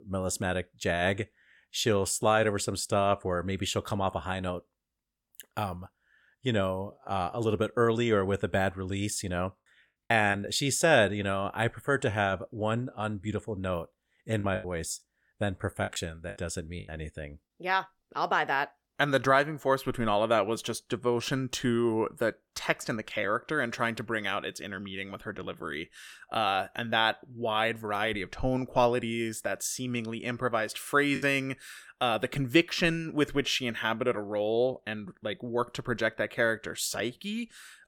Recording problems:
choppy; very; at 10 s, from 14 to 17 s and at 31 s; 8% of the speech affected

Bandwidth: 17 kHz